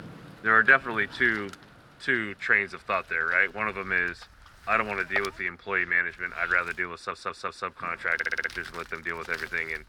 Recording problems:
thin; very; fading below 550 Hz
muffled; slightly; fading above 3.5 kHz
wind noise on the microphone; occasional gusts; 20 dB below the speech
rain or running water; faint; throughout; 30 dB below the speech
audio stuttering; at 7 s and at 8 s

